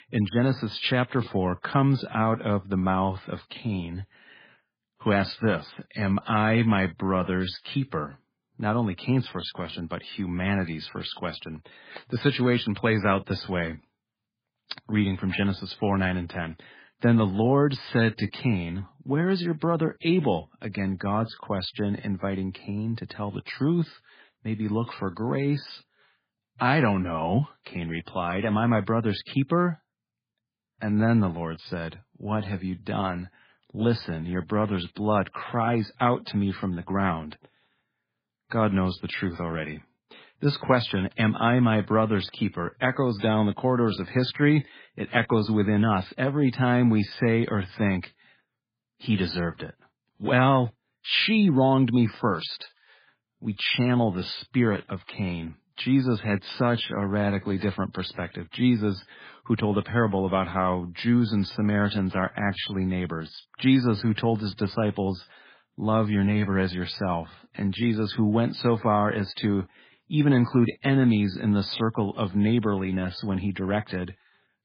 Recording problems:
garbled, watery; badly

